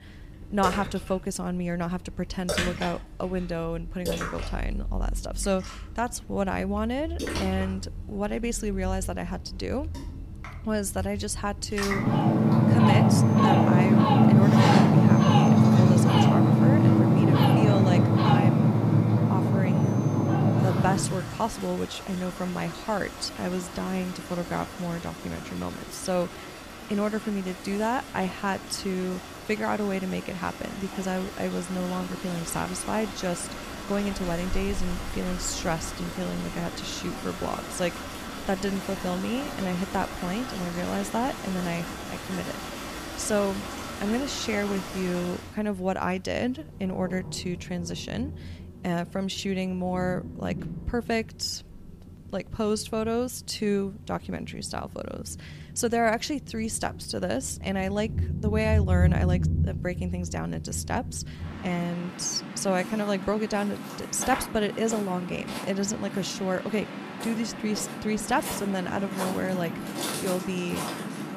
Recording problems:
rain or running water; very loud; throughout; 4 dB above the speech

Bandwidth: 15 kHz